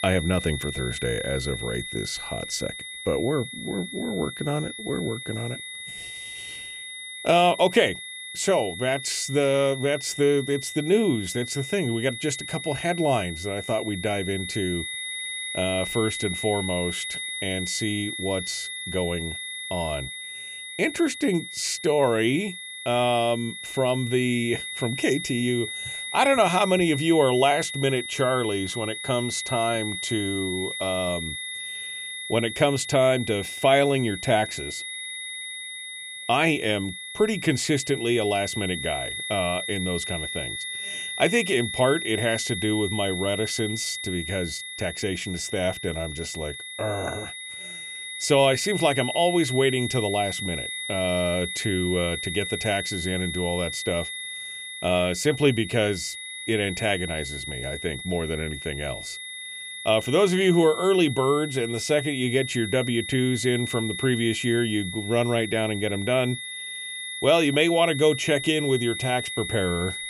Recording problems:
high-pitched whine; loud; throughout; 2 kHz, 7 dB below the speech

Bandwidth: 14.5 kHz